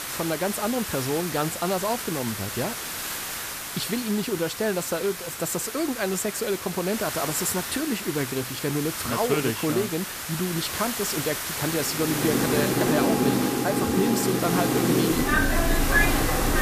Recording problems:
train or aircraft noise; very loud; from 12 s on; 4 dB above the speech
hiss; loud; throughout; 3 dB below the speech

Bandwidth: 14.5 kHz